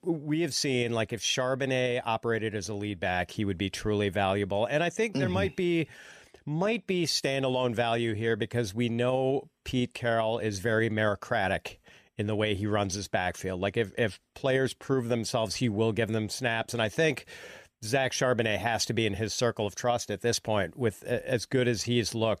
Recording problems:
none

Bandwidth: 14.5 kHz